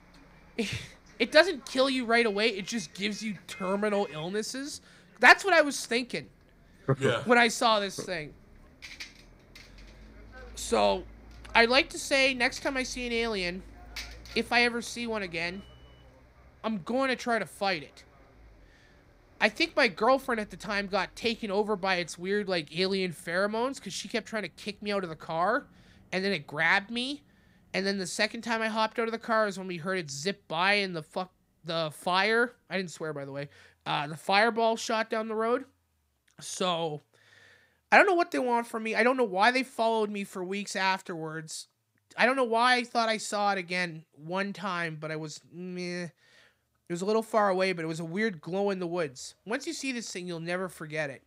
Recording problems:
traffic noise; faint; throughout; 25 dB below the speech

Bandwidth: 15.5 kHz